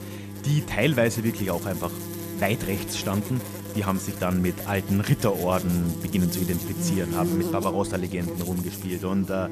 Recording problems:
electrical hum; loud; throughout; 50 Hz, 7 dB below the speech

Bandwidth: 14 kHz